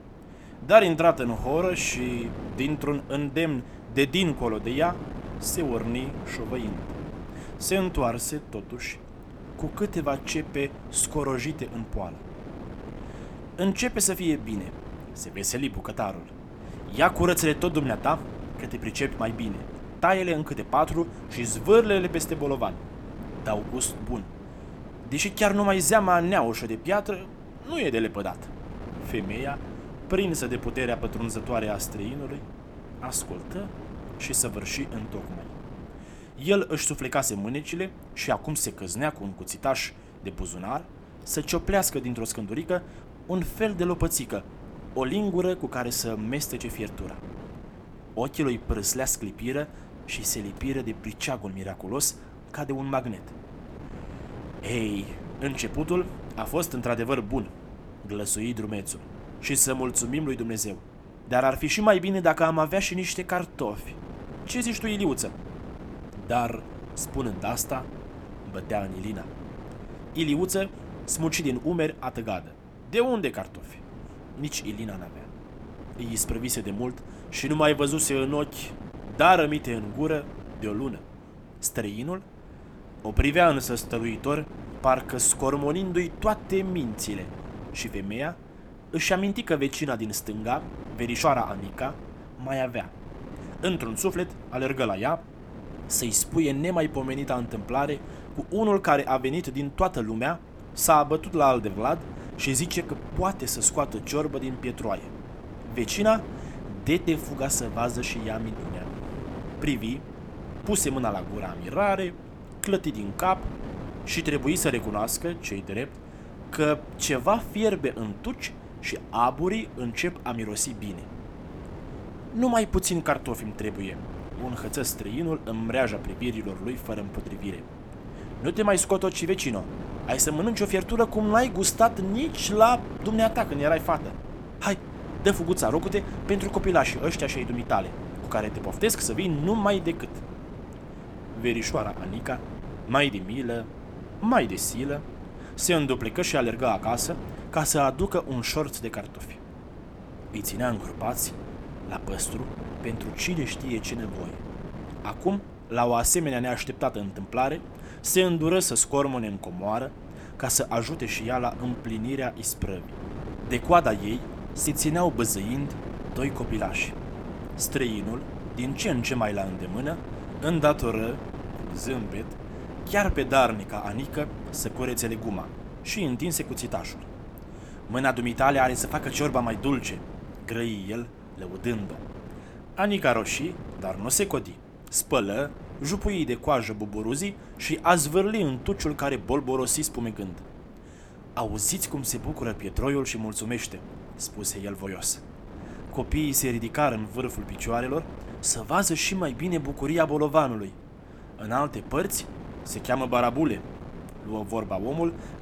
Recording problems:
wind noise on the microphone; occasional gusts; 15 dB below the speech

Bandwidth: 18 kHz